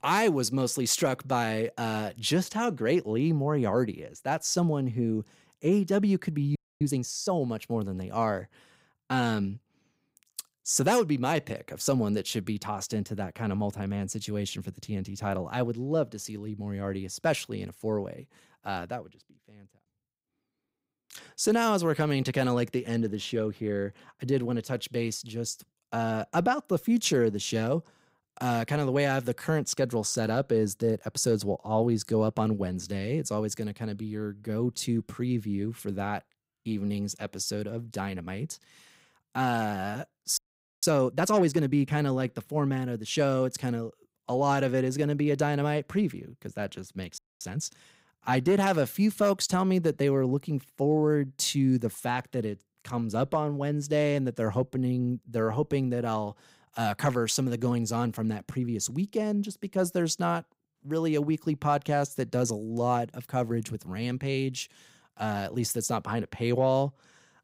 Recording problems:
audio freezing; at 6.5 s, at 40 s and at 47 s

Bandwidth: 15.5 kHz